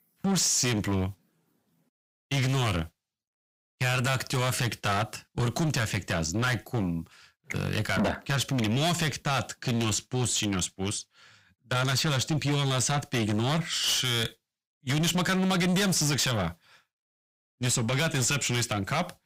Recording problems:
distortion; heavy; 5 dB below the speech

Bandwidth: 15.5 kHz